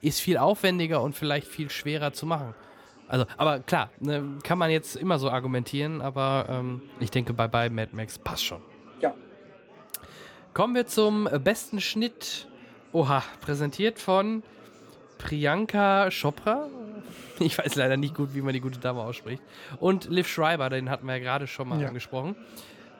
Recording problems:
chatter from many people; faint; throughout; 25 dB below the speech

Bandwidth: 18 kHz